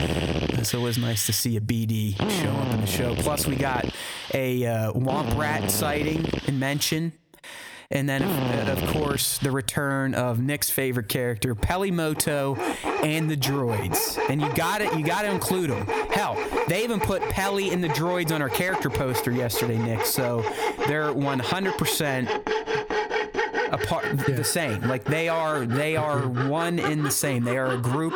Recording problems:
squashed, flat; somewhat, background pumping
machinery noise; loud; throughout; 4 dB below the speech

